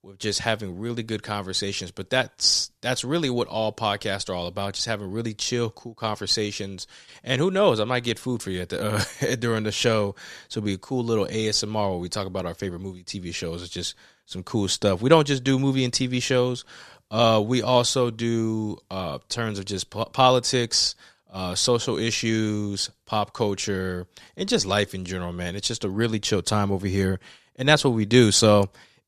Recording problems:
none

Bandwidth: 14 kHz